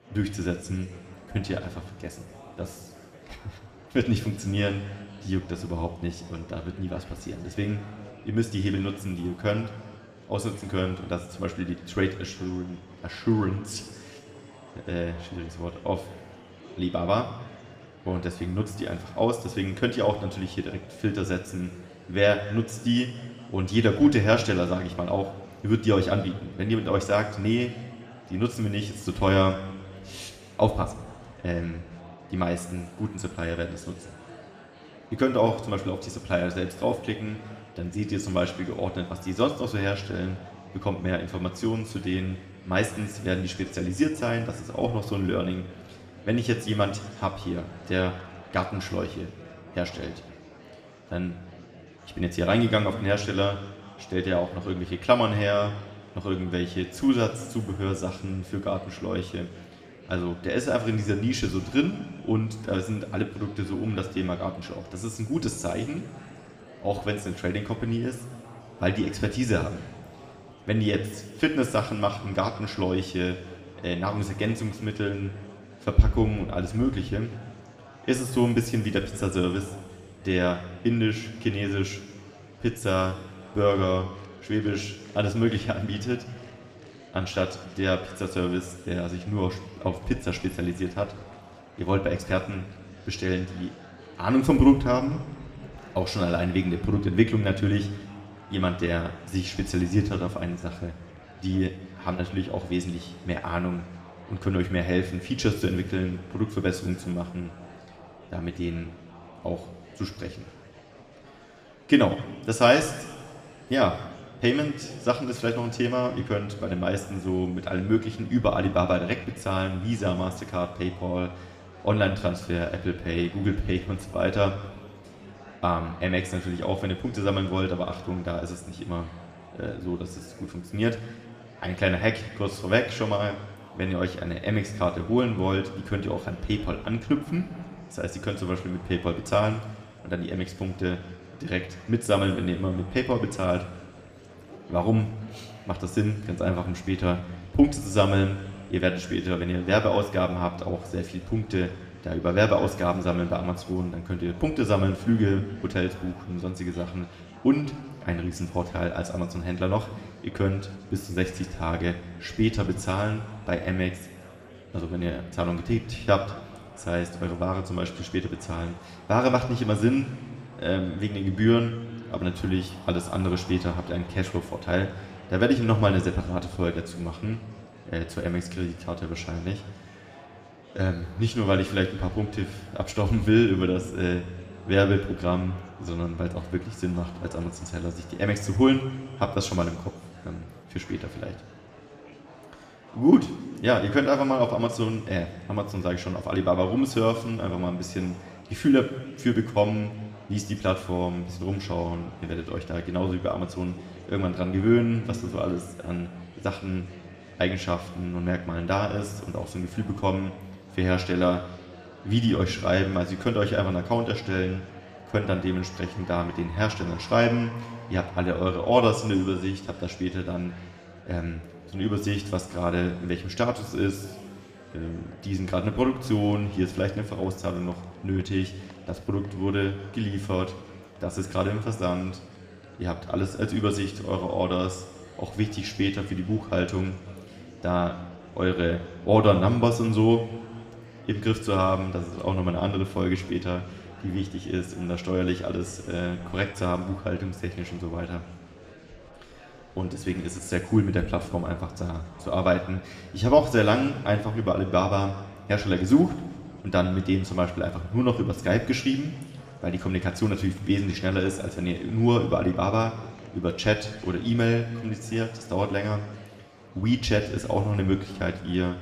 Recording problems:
room echo; slight; dies away in 1.4 s
off-mic speech; somewhat distant
murmuring crowd; faint; throughout; 20 dB below the speech

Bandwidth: 15 kHz